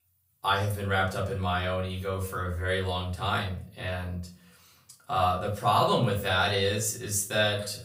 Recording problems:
off-mic speech; far
room echo; slight; dies away in 0.3 s

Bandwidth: 15.5 kHz